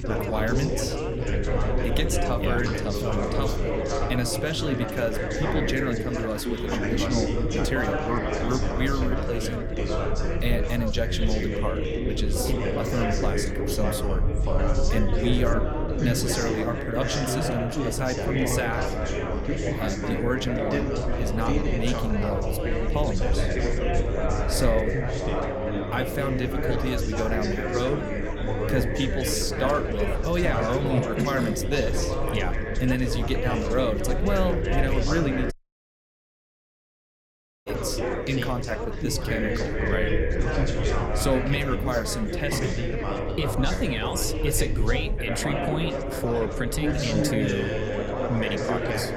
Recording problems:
chatter from many people; very loud; throughout; as loud as the speech
low rumble; noticeable; throughout; 20 dB below the speech
audio cutting out; at 36 s for 2 s

